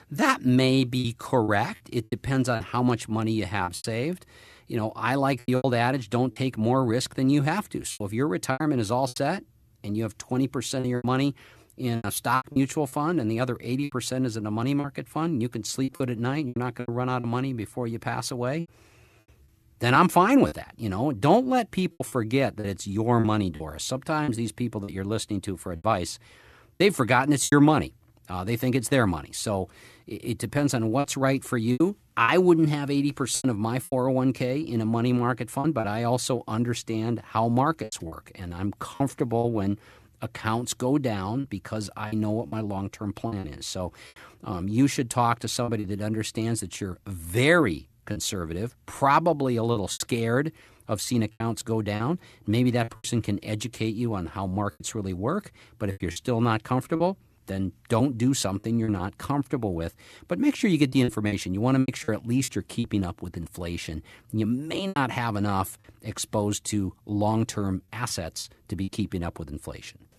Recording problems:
choppy; very; 7% of the speech affected

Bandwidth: 13.5 kHz